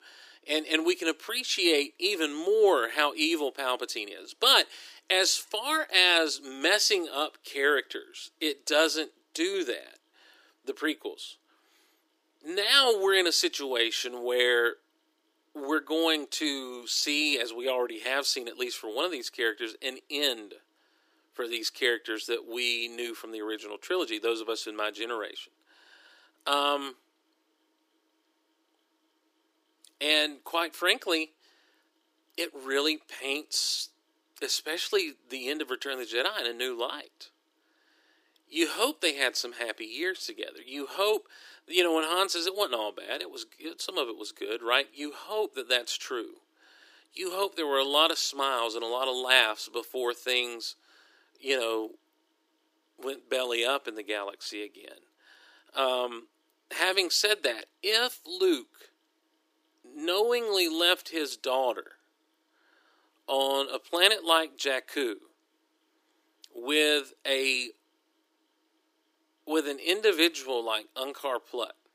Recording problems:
thin; very; fading below 300 Hz

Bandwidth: 15 kHz